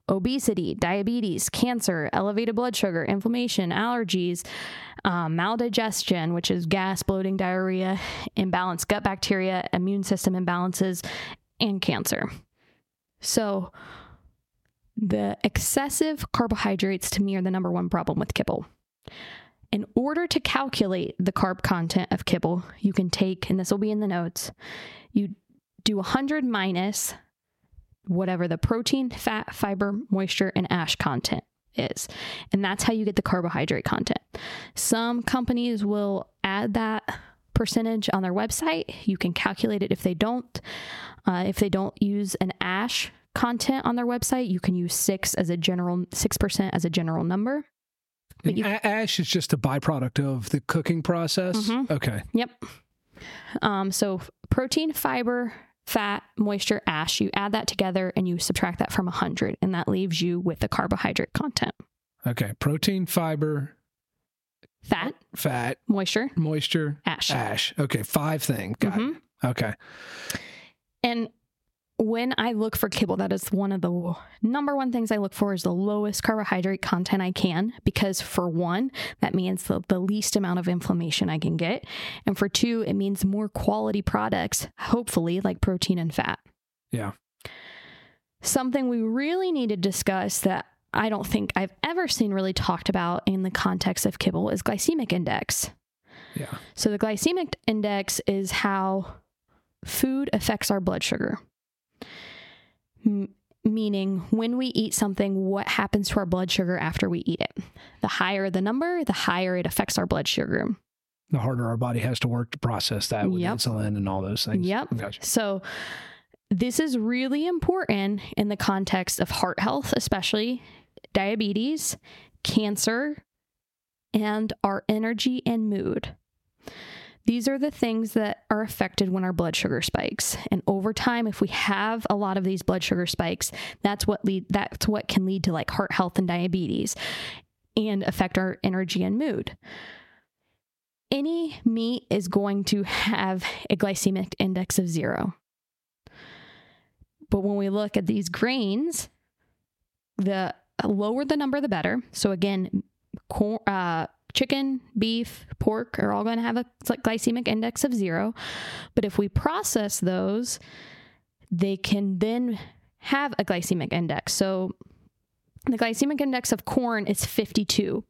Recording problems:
squashed, flat; heavily

